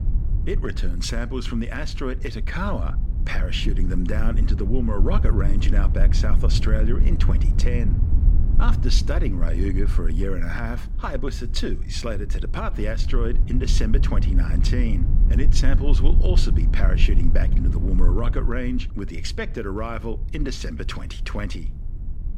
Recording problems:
low rumble; loud; throughout; 10 dB below the speech

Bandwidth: 16 kHz